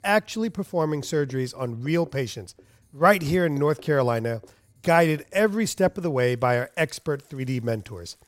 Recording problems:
household noises; faint; throughout; 30 dB below the speech

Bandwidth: 16 kHz